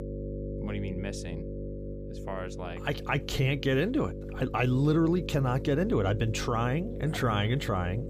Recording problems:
electrical hum; noticeable; throughout; 50 Hz, 10 dB below the speech

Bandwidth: 15.5 kHz